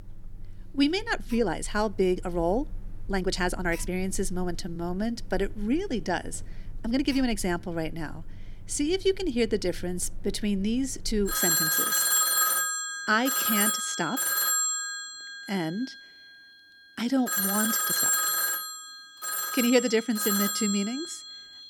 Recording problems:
alarms or sirens; very loud; throughout; 3 dB above the speech
uneven, jittery; strongly; from 1 to 20 s

